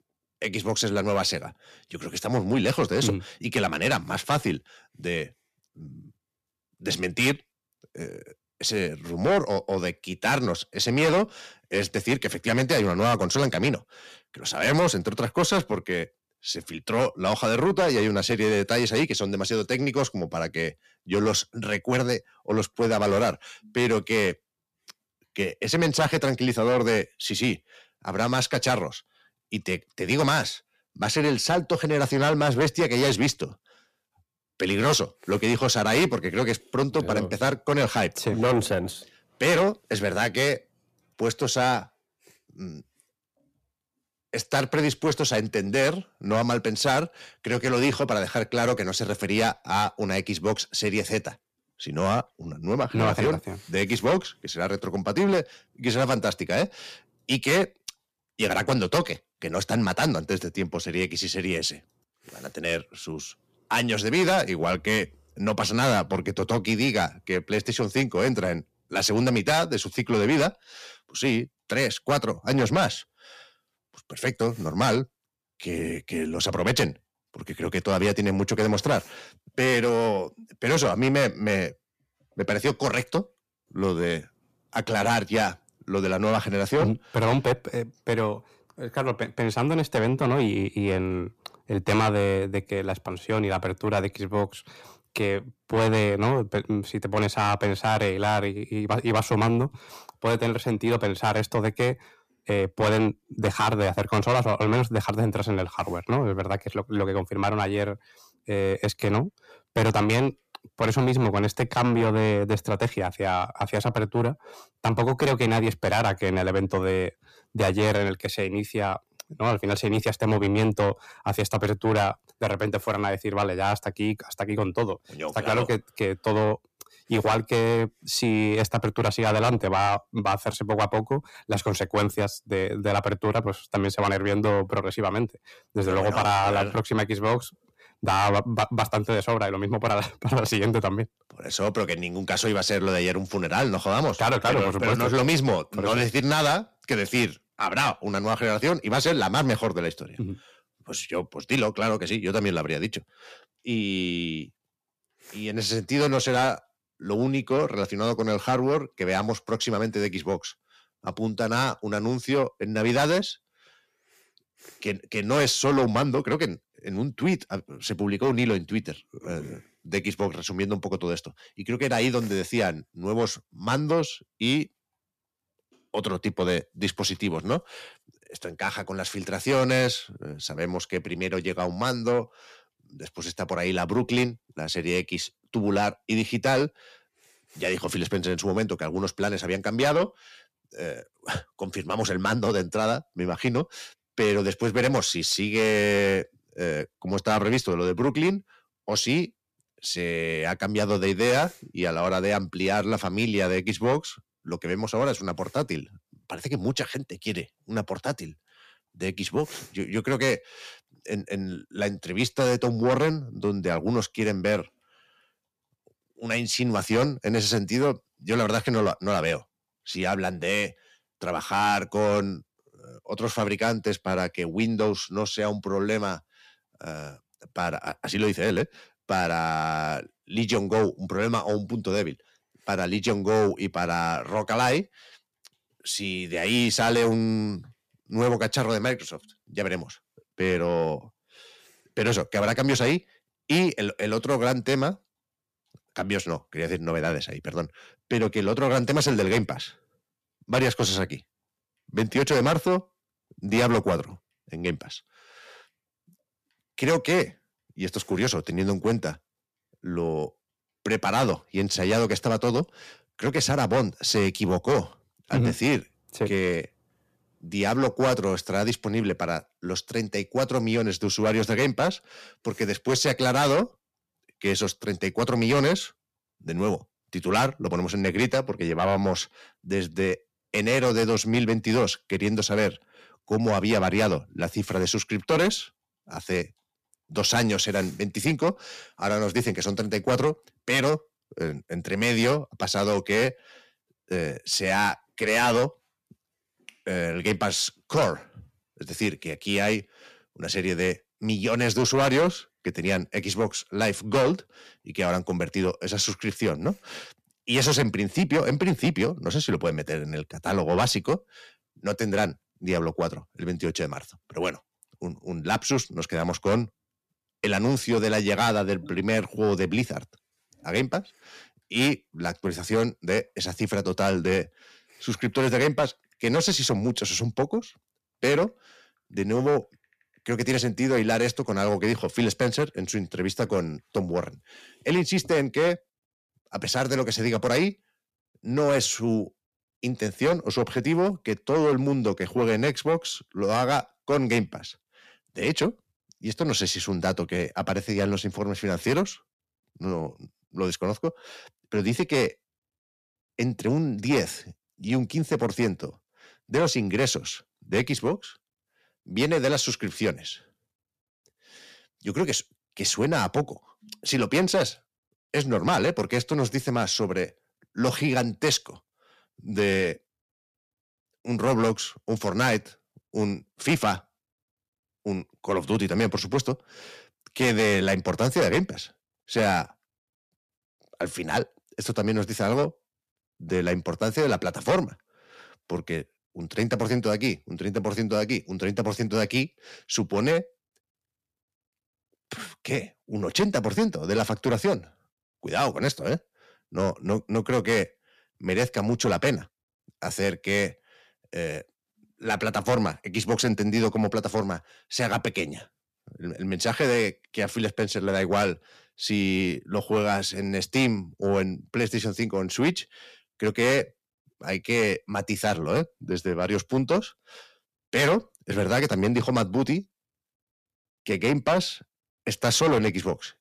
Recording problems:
distortion; heavy; 8 dB below the speech

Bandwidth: 14.5 kHz